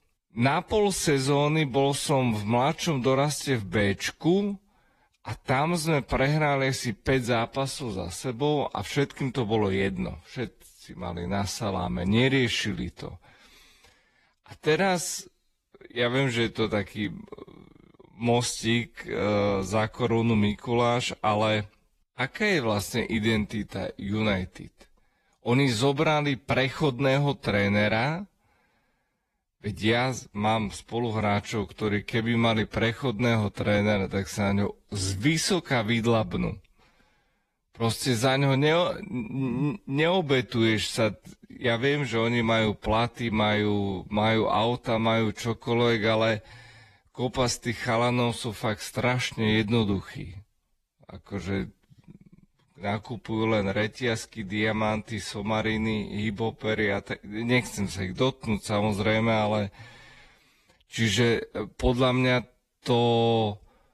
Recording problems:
wrong speed, natural pitch; too slow; 0.6 times normal speed
garbled, watery; slightly

